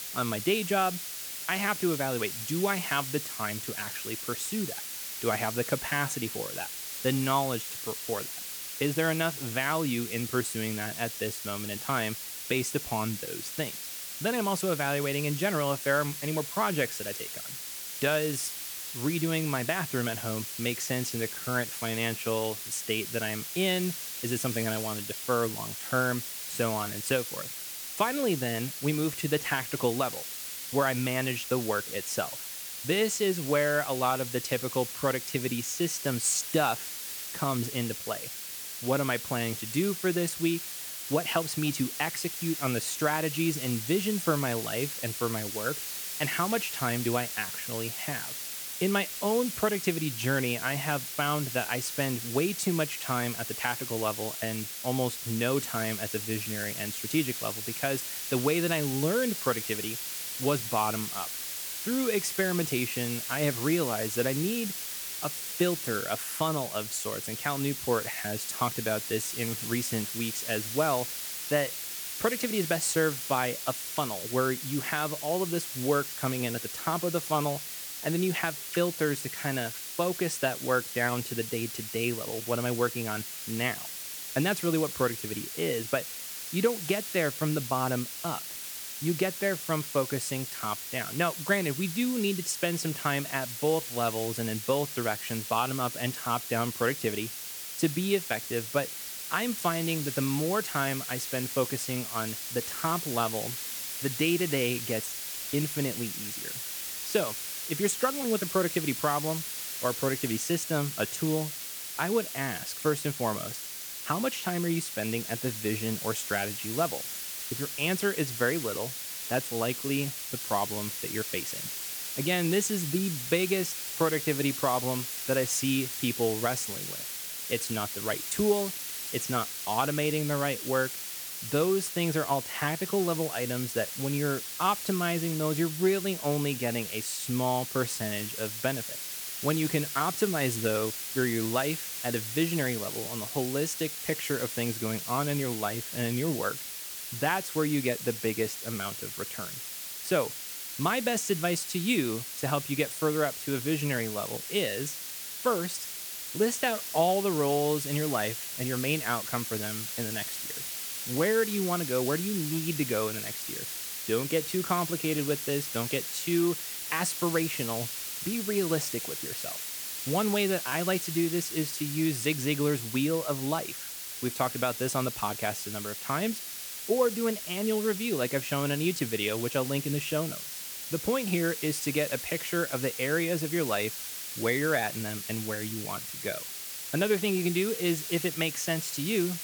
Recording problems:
hiss; loud; throughout; 4 dB below the speech

